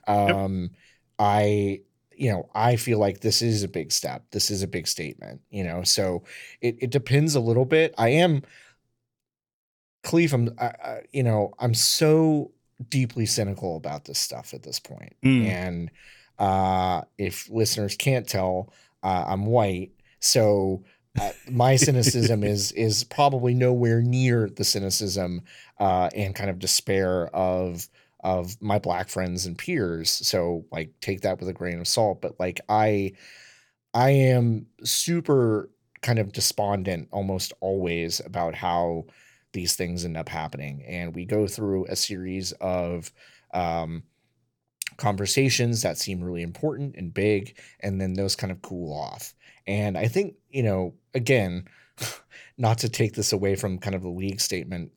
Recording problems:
none

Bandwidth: 18 kHz